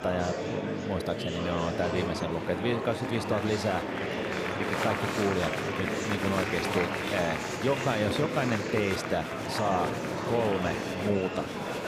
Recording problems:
murmuring crowd; loud; throughout; as loud as the speech

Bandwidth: 15 kHz